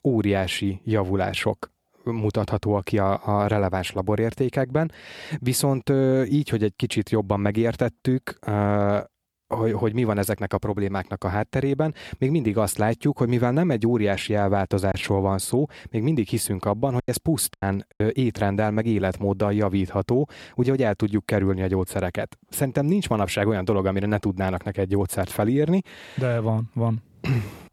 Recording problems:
choppy; very; from 15 to 18 s; 8% of the speech affected

